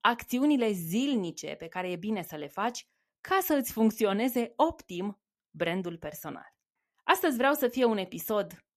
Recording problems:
none

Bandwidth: 14 kHz